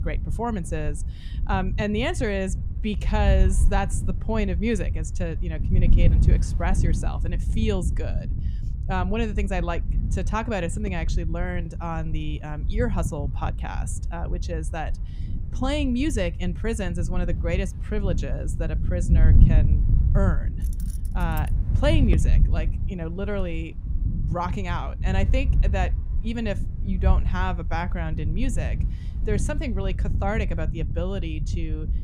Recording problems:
wind noise on the microphone; occasional gusts; 10 dB below the speech
jangling keys; faint; at 21 s; peak 15 dB below the speech

